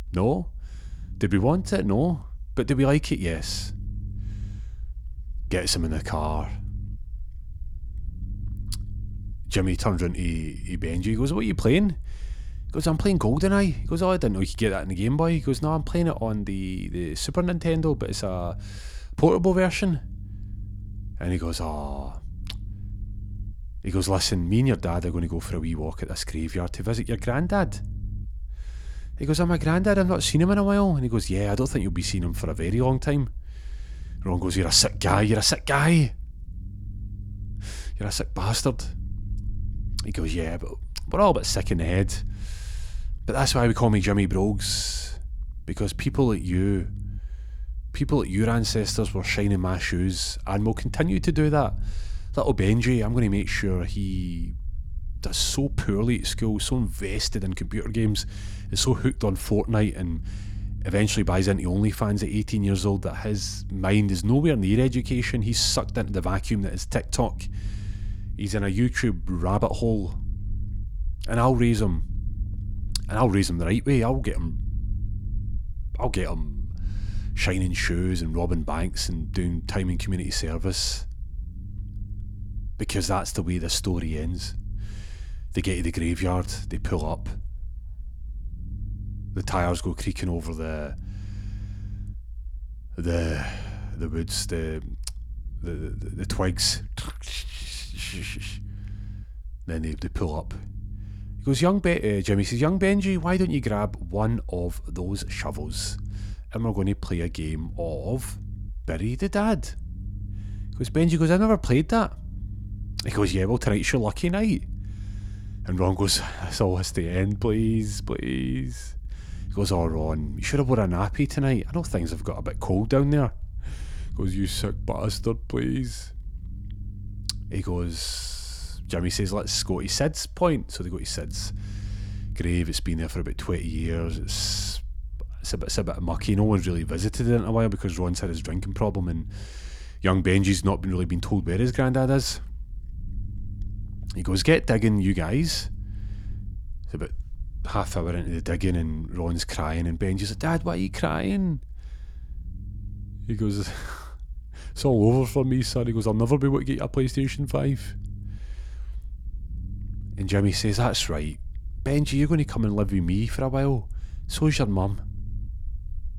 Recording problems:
low rumble; faint; throughout; 25 dB below the speech

